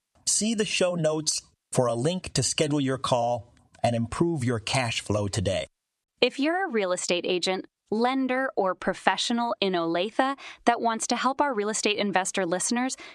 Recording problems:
squashed, flat; somewhat

